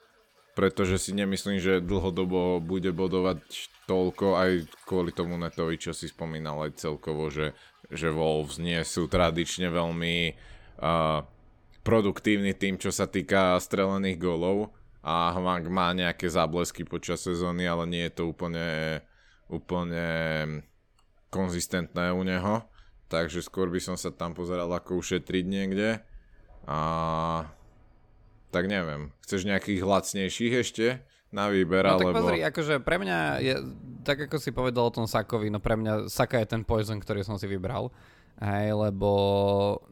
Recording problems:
rain or running water; faint; throughout; 30 dB below the speech

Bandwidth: 18 kHz